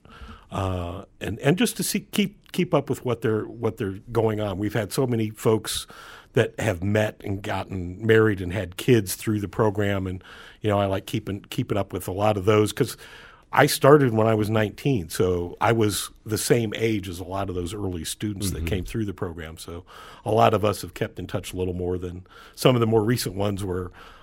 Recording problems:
none

